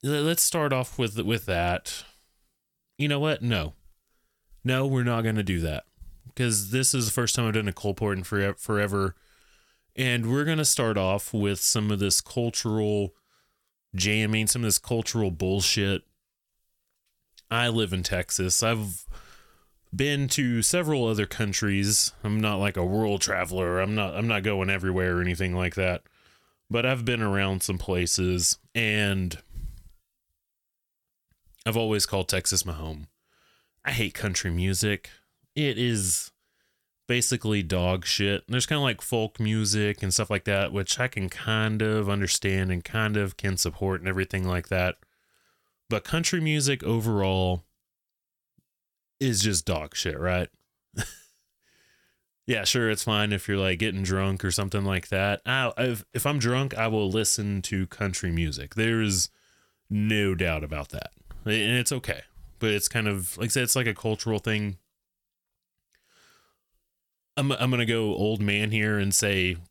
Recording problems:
none

